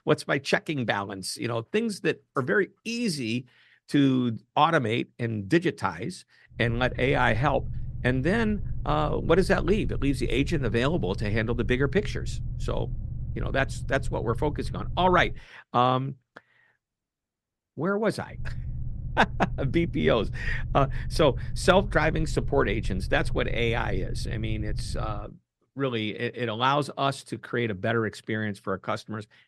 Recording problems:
low rumble; faint; from 6.5 to 15 s and from 18 to 25 s; 20 dB below the speech

